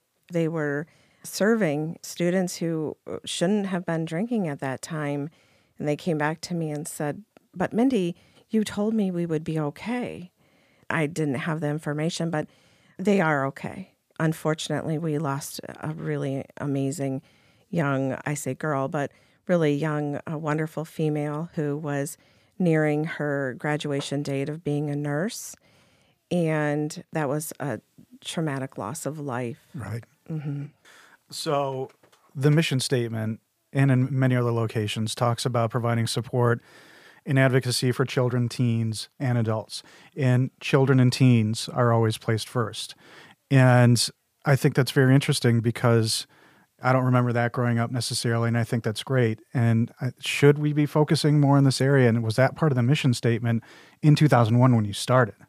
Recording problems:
none

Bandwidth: 15 kHz